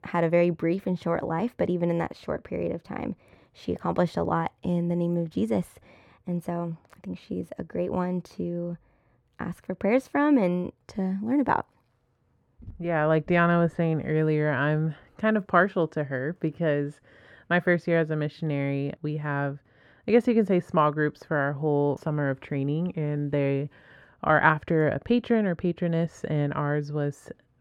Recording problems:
muffled; slightly; fading above 2.5 kHz

